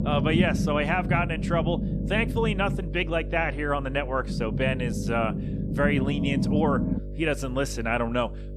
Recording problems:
low rumble; loud; until 3 s and from 4 to 7 s; 9 dB below the speech
electrical hum; noticeable; throughout; 50 Hz, 20 dB below the speech

